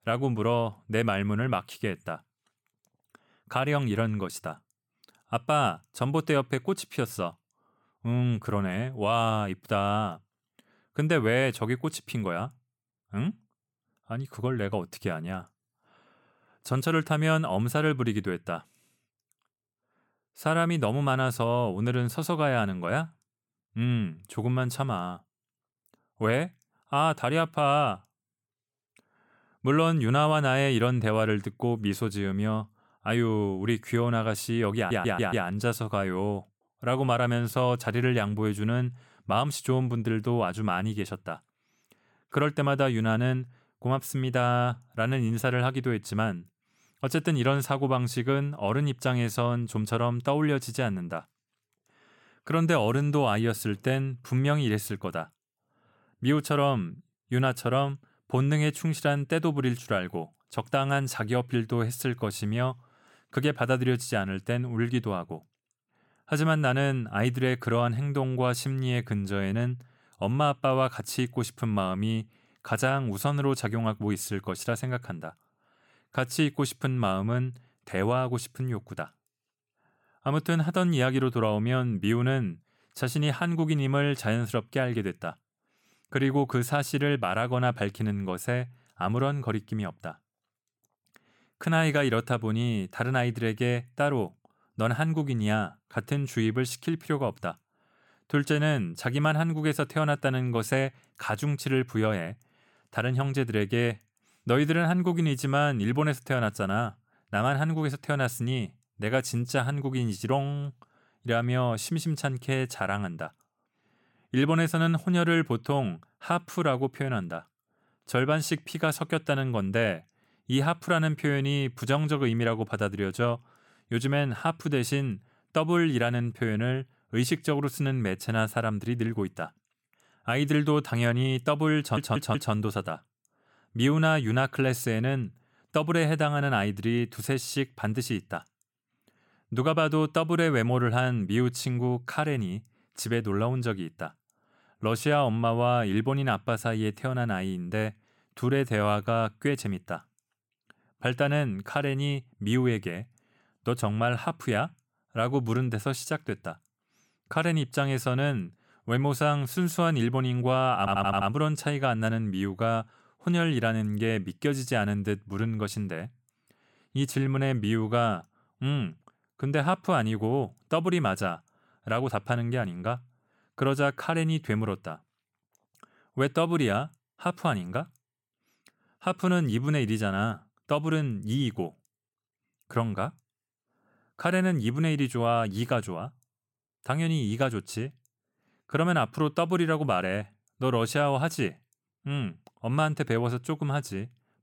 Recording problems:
audio stuttering; at 35 s, at 2:12 and at 2:41

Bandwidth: 17.5 kHz